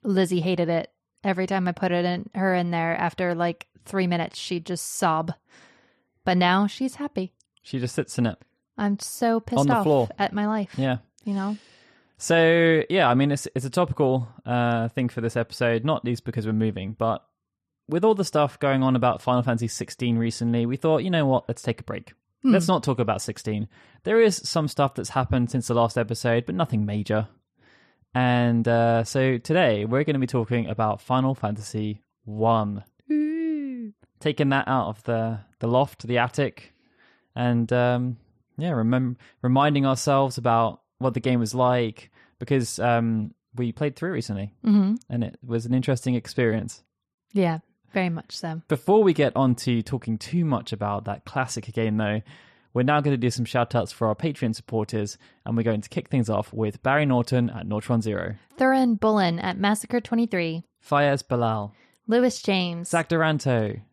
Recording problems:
none

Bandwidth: 13.5 kHz